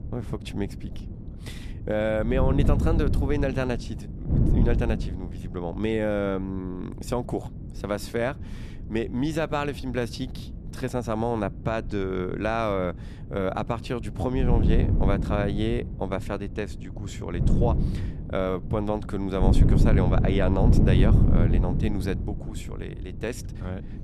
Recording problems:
wind noise on the microphone; heavy; 6 dB below the speech

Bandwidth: 13.5 kHz